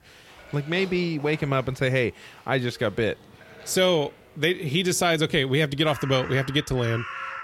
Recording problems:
animal sounds; noticeable; throughout; 15 dB below the speech

